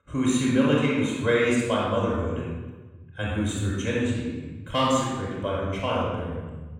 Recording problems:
room echo; strong; dies away in 1.3 s
off-mic speech; far

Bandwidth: 16 kHz